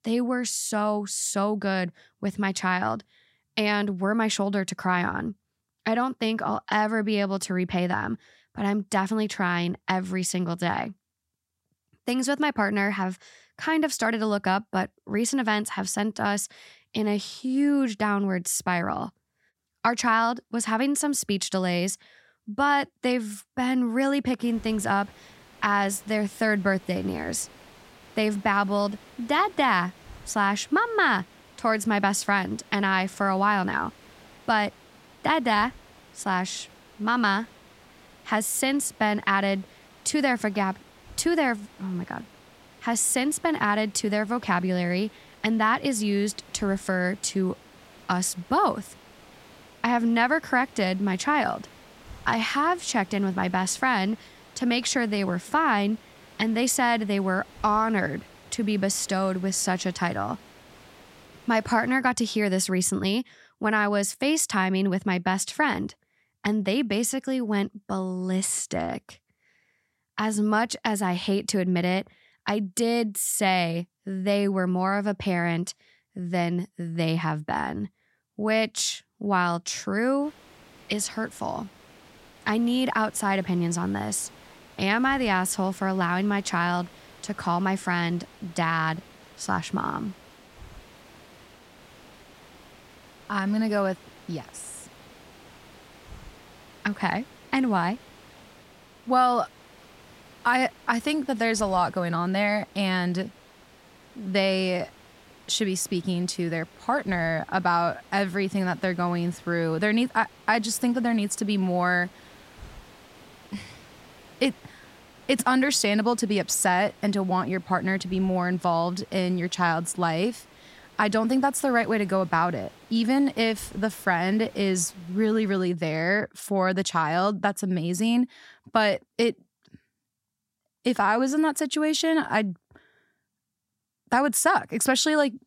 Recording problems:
hiss; faint; from 24 s to 1:02 and from 1:20 to 2:06; 25 dB below the speech

